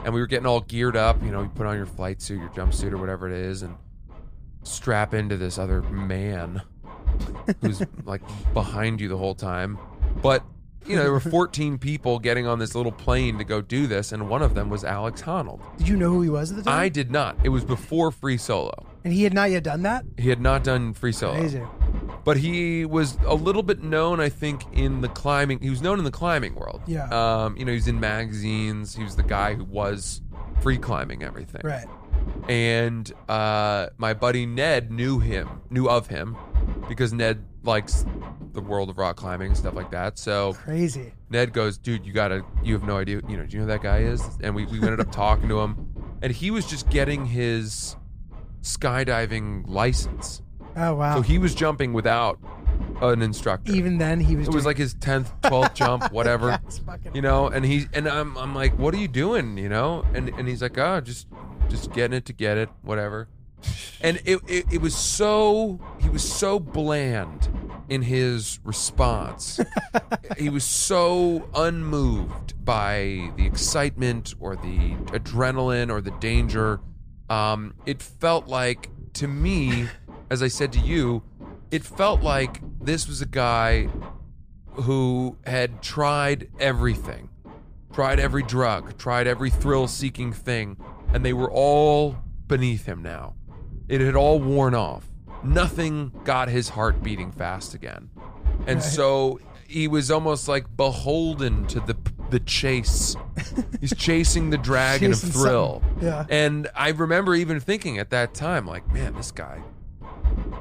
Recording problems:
low rumble; noticeable; throughout; 20 dB below the speech

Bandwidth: 14.5 kHz